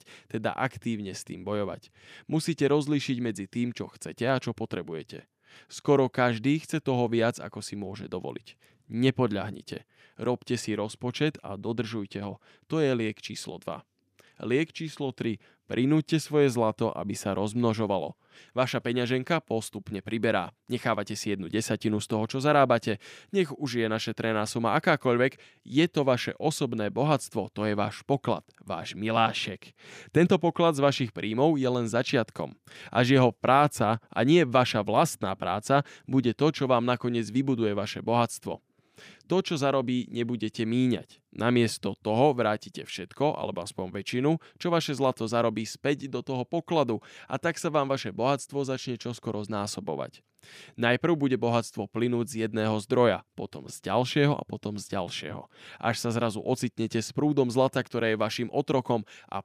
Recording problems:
none

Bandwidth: 15 kHz